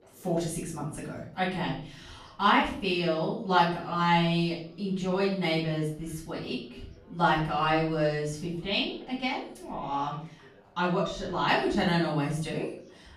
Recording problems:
off-mic speech; far
room echo; noticeable; dies away in 0.5 s
background chatter; faint; throughout; 4 voices, 30 dB below the speech

